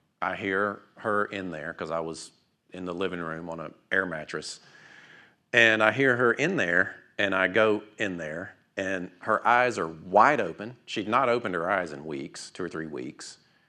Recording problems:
none

